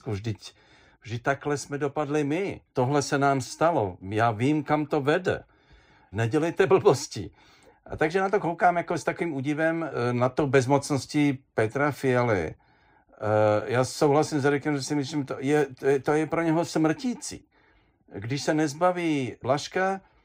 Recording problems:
none

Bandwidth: 15.5 kHz